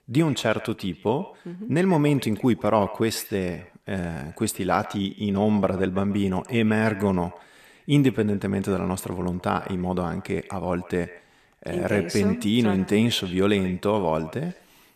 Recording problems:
echo of what is said; faint; throughout; 140 ms later, 20 dB below the speech

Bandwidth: 14 kHz